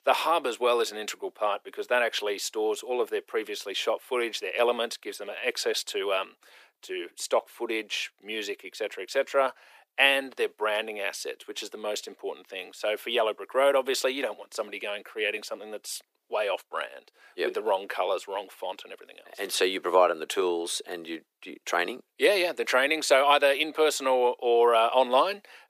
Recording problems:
thin; very; fading below 350 Hz

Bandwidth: 15 kHz